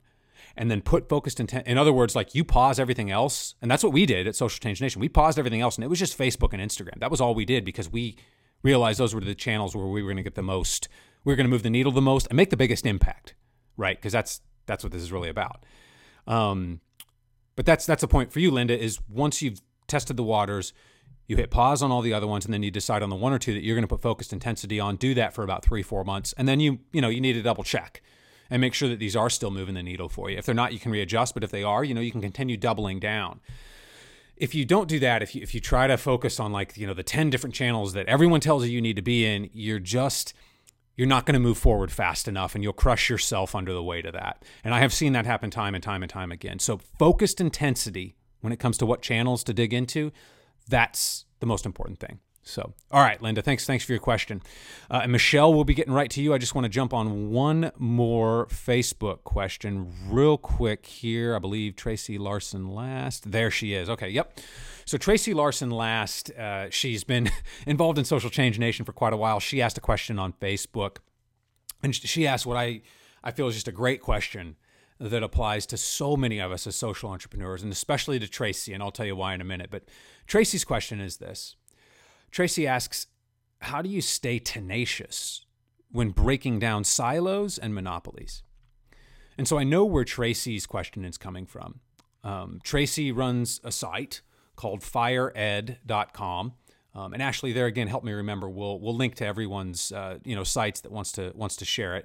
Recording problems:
none

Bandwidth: 16 kHz